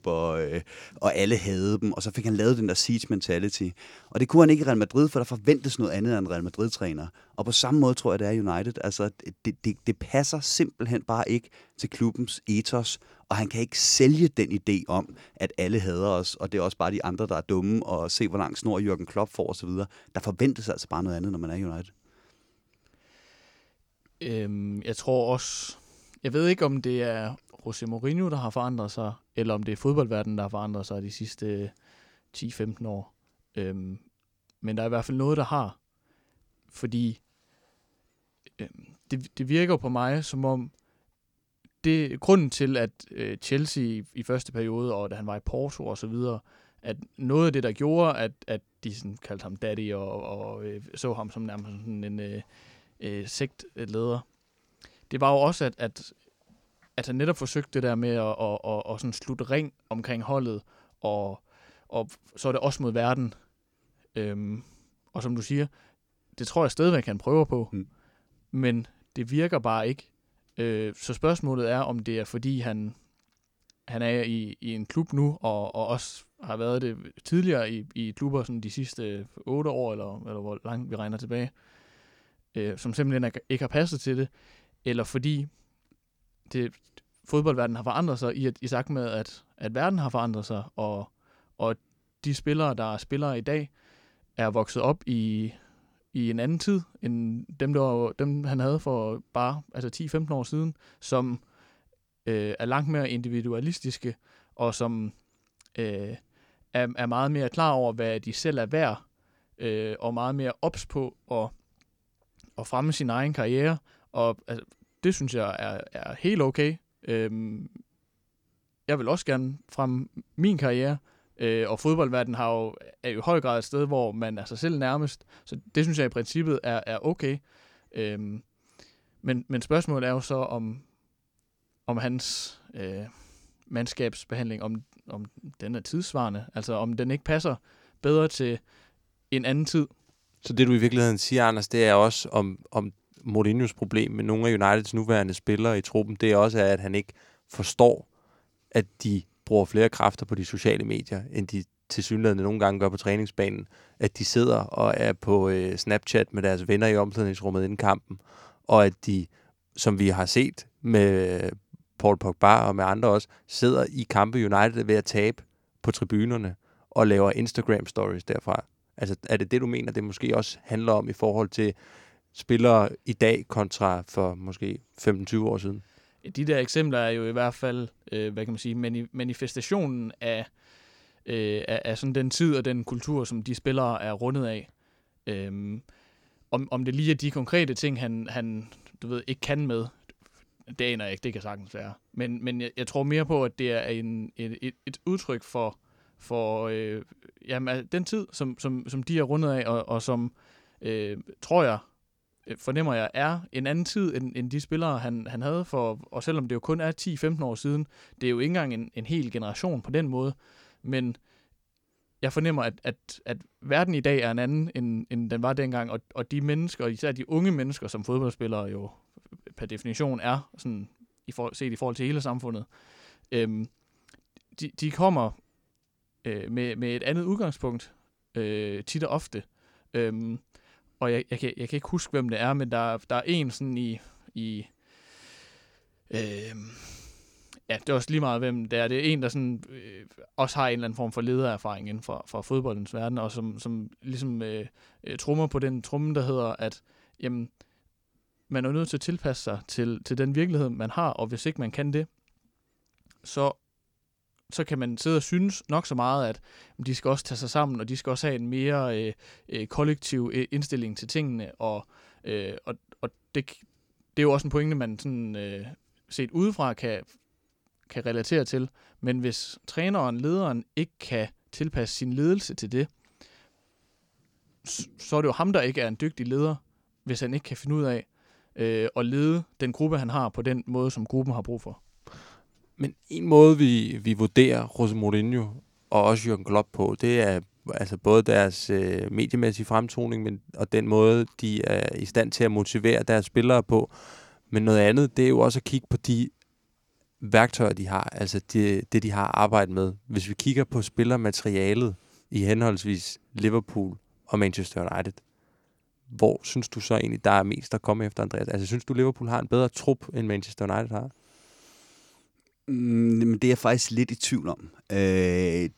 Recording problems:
none

